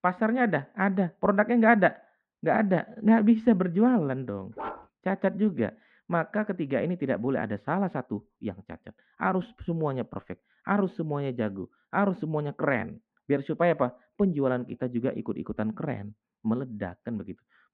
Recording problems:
muffled; very; fading above 2 kHz
dog barking; faint; at 4.5 s; peak 10 dB below the speech

